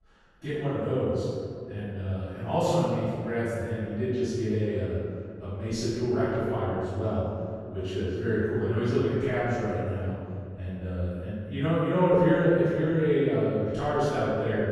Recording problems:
room echo; strong; dies away in 2.2 s
off-mic speech; far

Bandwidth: 13.5 kHz